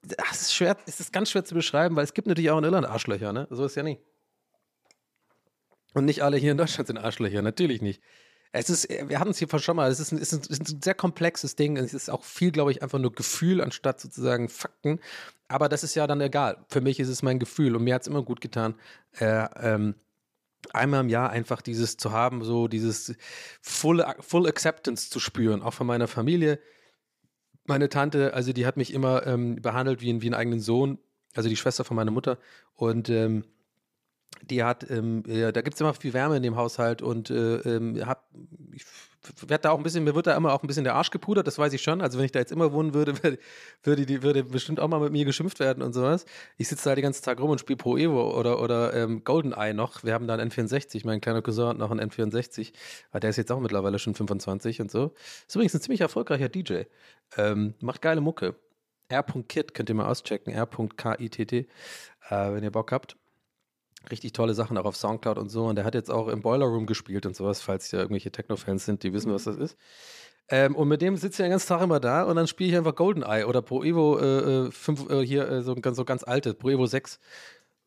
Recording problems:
none

